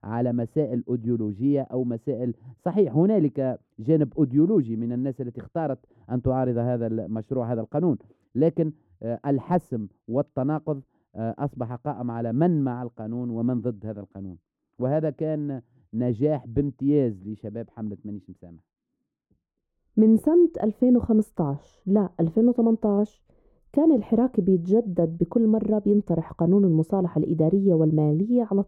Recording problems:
muffled; very; fading above 1 kHz

